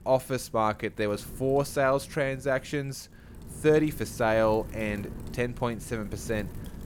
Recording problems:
wind noise on the microphone; occasional gusts; 25 dB below the speech

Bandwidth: 17 kHz